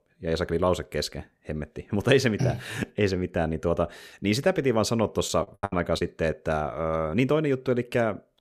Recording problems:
choppy; very; at 5.5 s; 25% of the speech affected

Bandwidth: 14.5 kHz